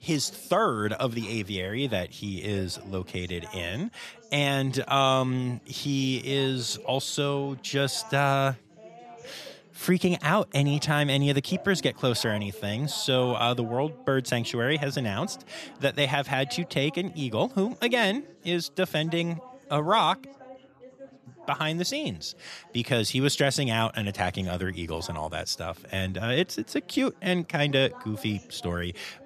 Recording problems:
background chatter; faint; throughout; 4 voices, 20 dB below the speech

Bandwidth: 14 kHz